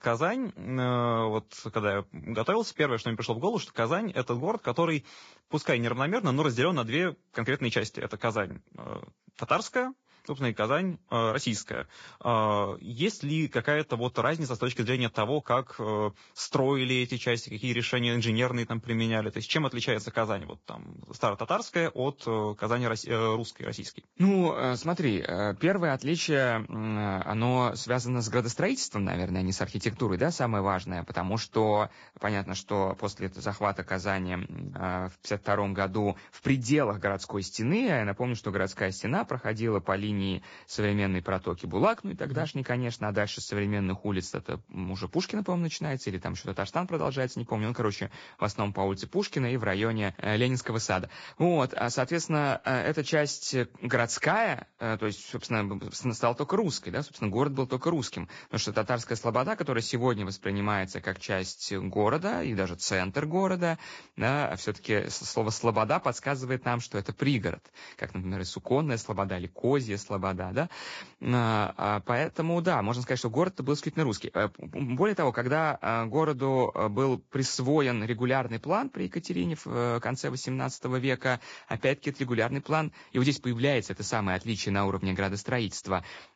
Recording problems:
garbled, watery; badly; nothing above 7.5 kHz

